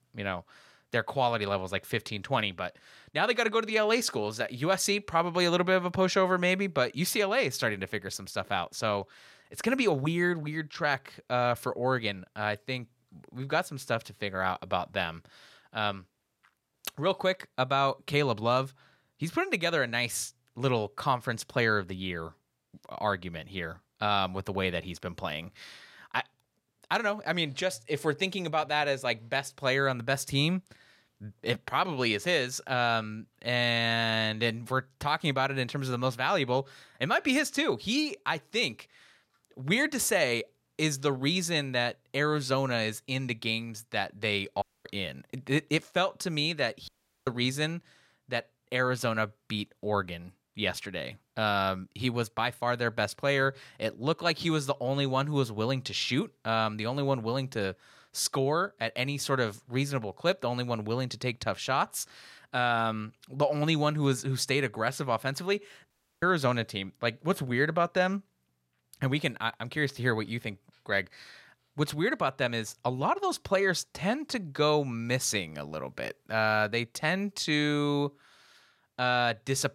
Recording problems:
audio cutting out; at 45 s, at 47 s and at 1:06

